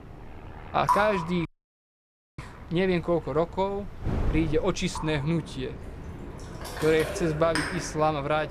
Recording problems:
rain or running water; loud; throughout; 6 dB below the speech
wind noise on the microphone; occasional gusts; 20 dB below the speech
train or aircraft noise; faint; throughout; 25 dB below the speech
audio cutting out; at 1.5 s for 1 s

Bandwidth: 15 kHz